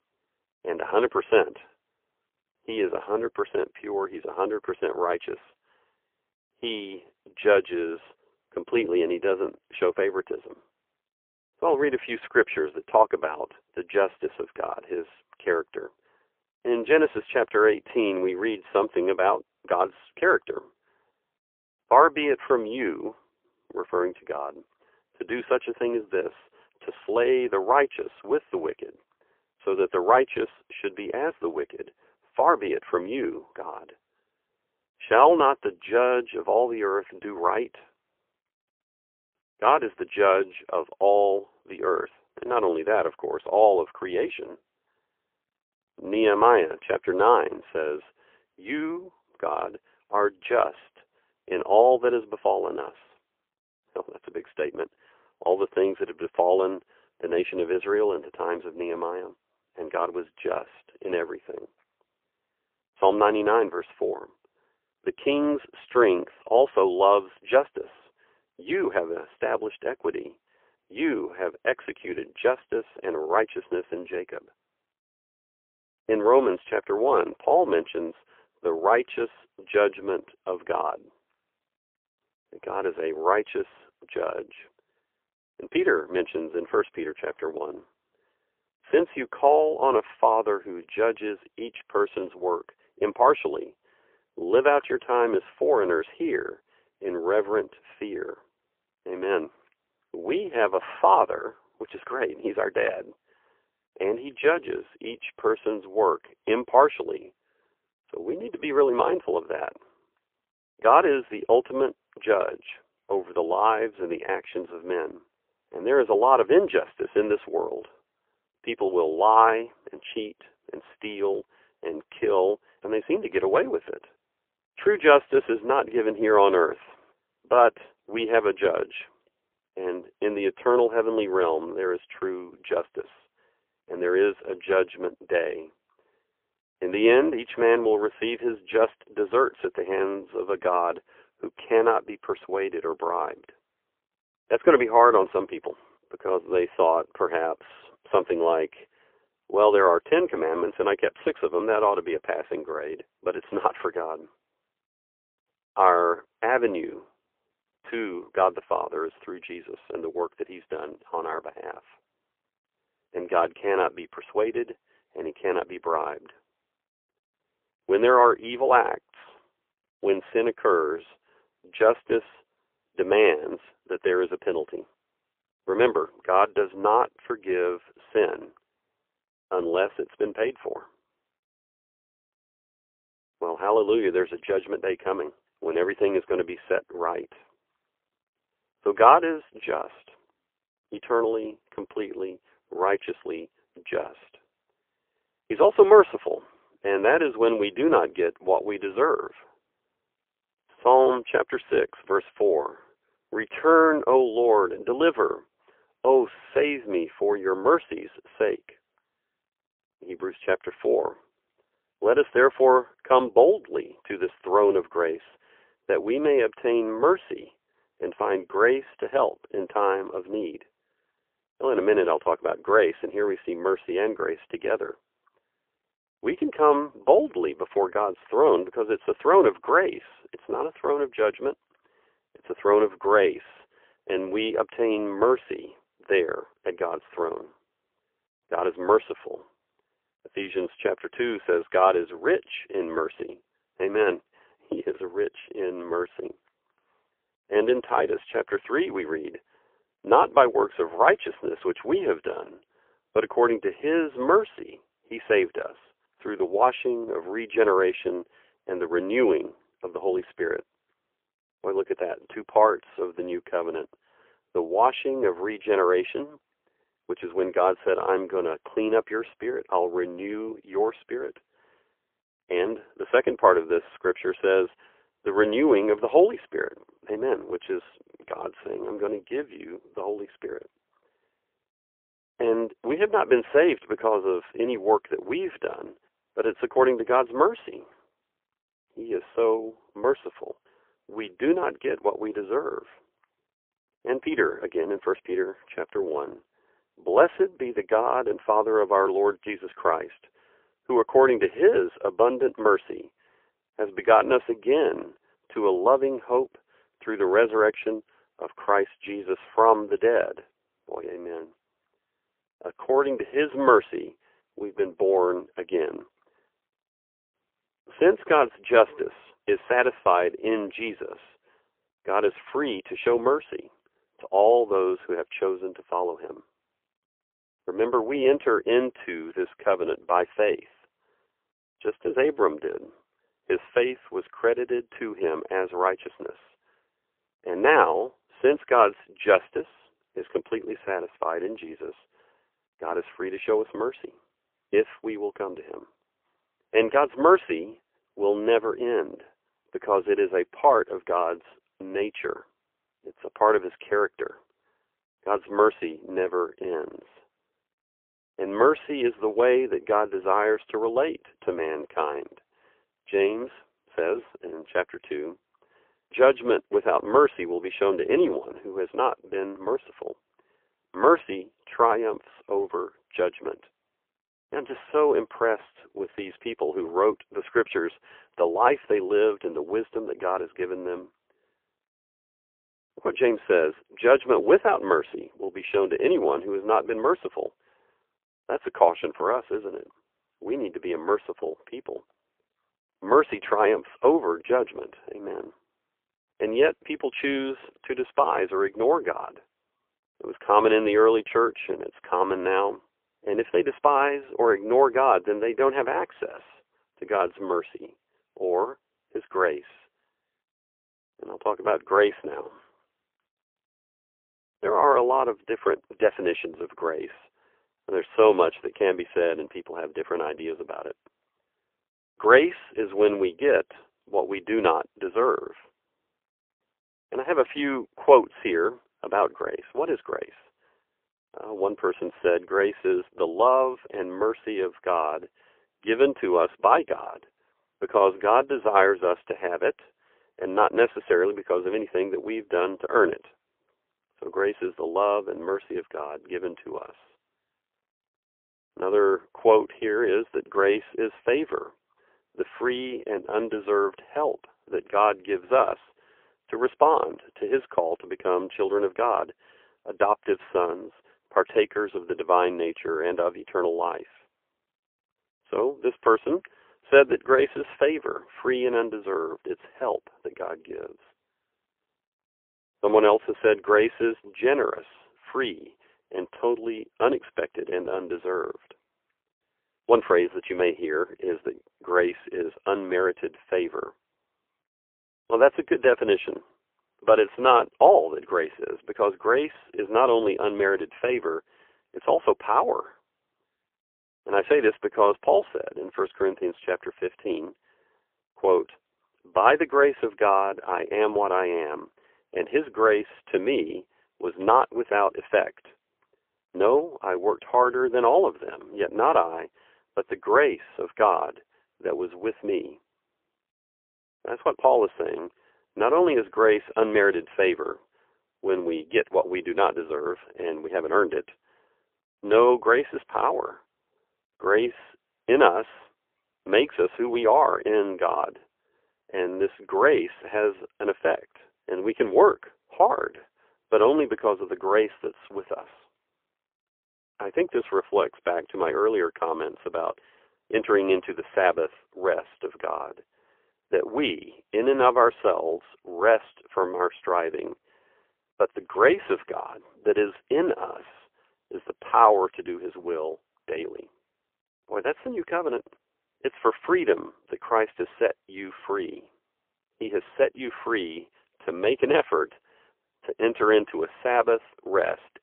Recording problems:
phone-call audio; poor line; nothing above 3.5 kHz

